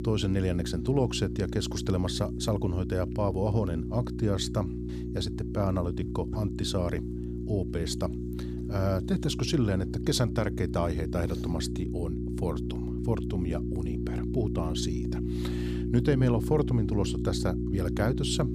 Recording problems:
electrical hum; loud; throughout; 60 Hz, 6 dB below the speech

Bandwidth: 15 kHz